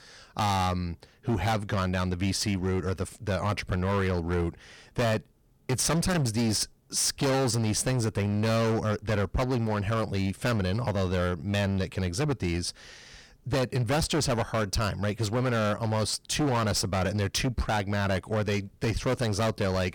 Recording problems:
distortion; heavy; 20% of the sound clipped

